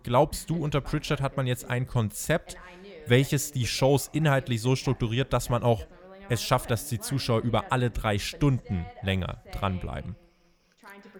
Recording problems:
voice in the background; faint; throughout; 20 dB below the speech

